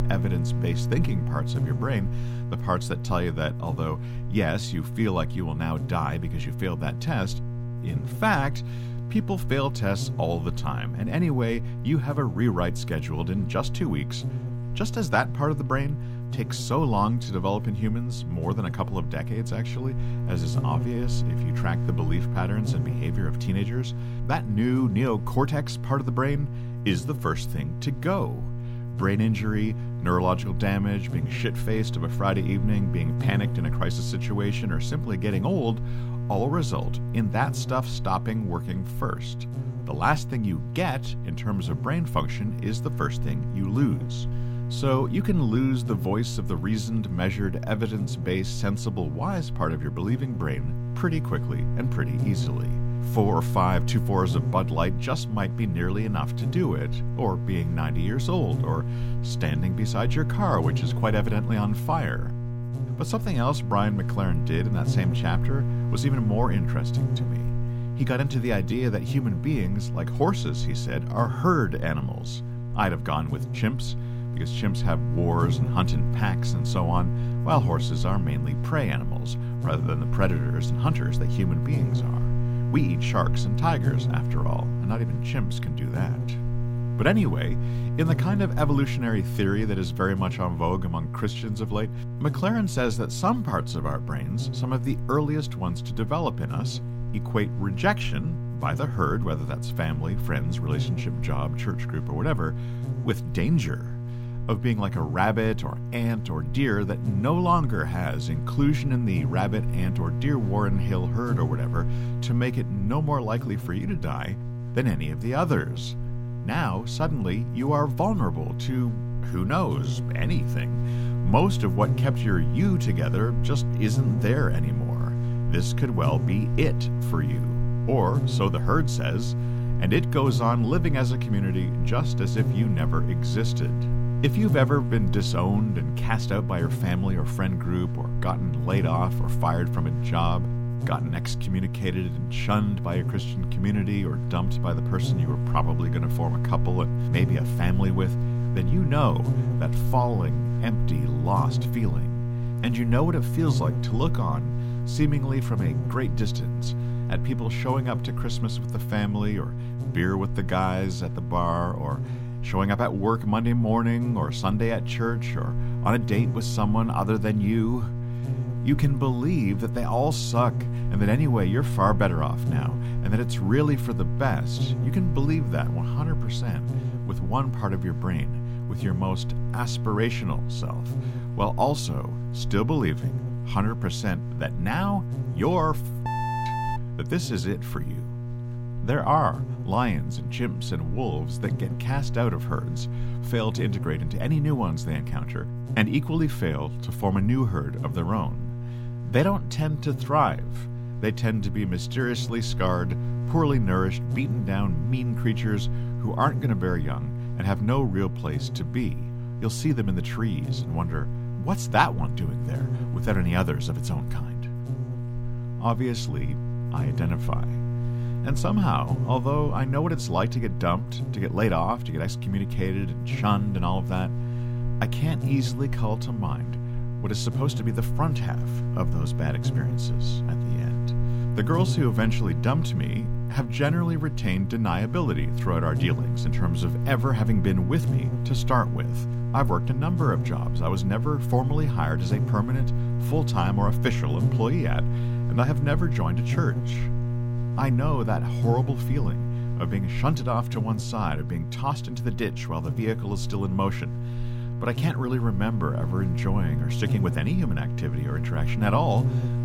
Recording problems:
electrical hum; loud; throughout; 60 Hz, 9 dB below the speech

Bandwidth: 16 kHz